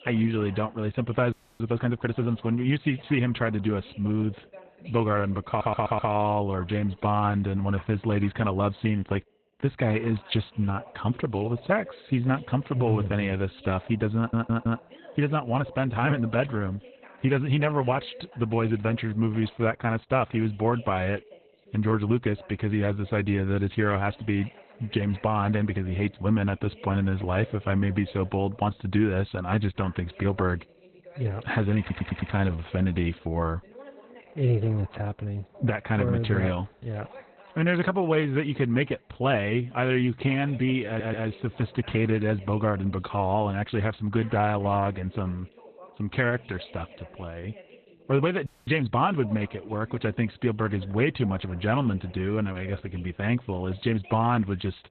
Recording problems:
garbled, watery; badly; nothing above 4 kHz
voice in the background; faint; throughout; 25 dB below the speech
audio freezing; at 1.5 s and at 48 s
audio stuttering; 4 times, first at 5.5 s

